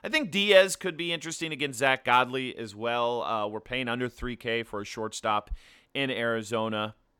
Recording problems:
none

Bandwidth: 17.5 kHz